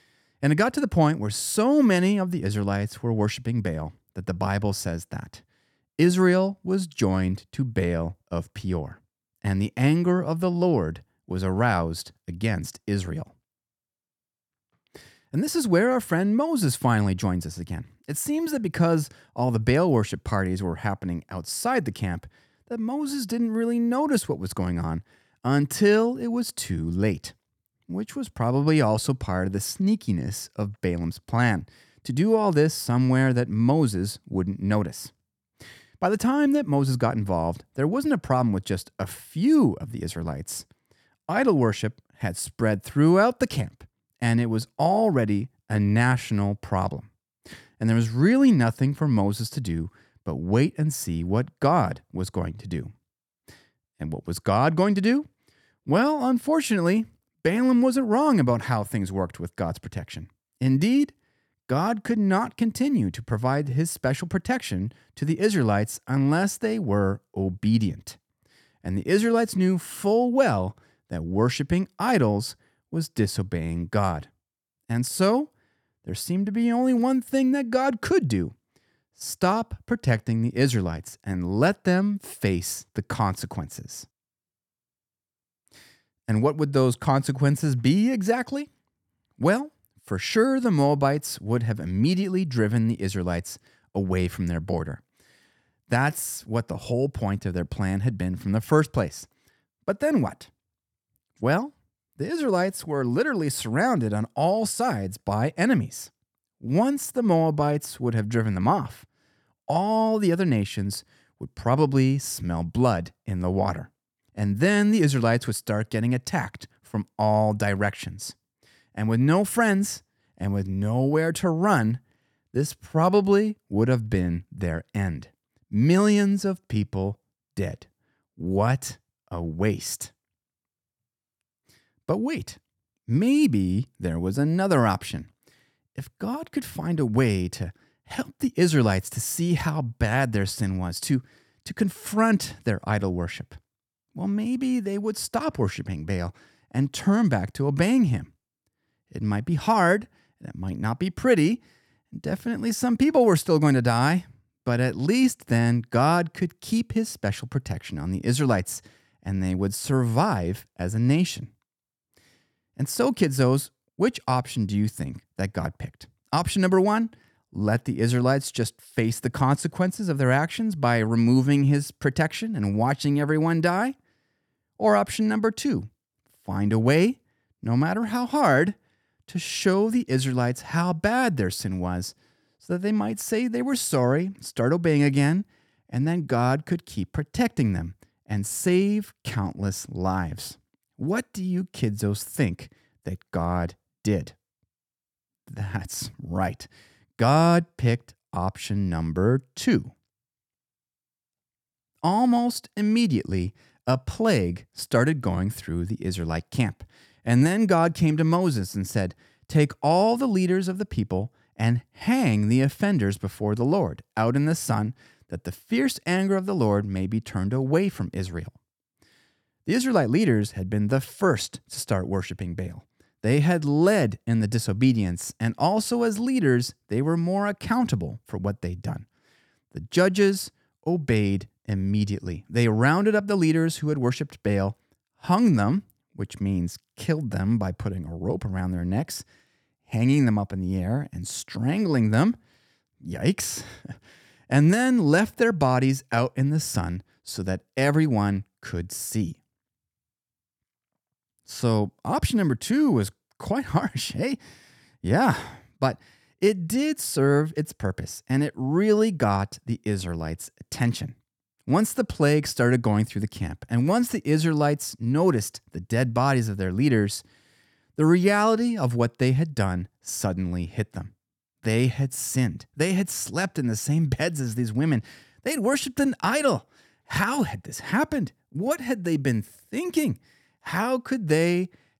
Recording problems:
none

